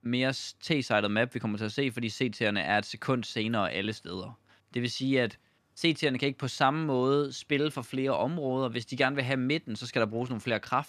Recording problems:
none

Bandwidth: 14 kHz